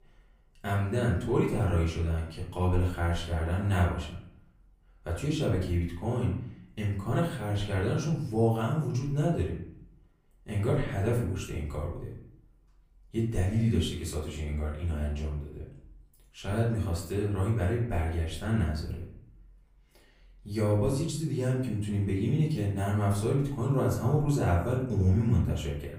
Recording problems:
off-mic speech; far
room echo; slight; dies away in 0.6 s

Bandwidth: 15.5 kHz